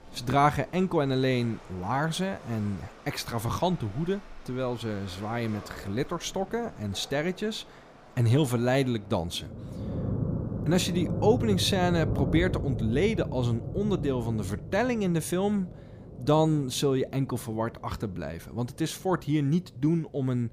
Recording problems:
rain or running water; loud; throughout; 7 dB below the speech

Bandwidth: 15 kHz